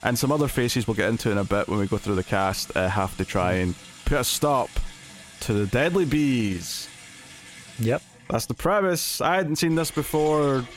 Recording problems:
household noises; noticeable; throughout; 20 dB below the speech

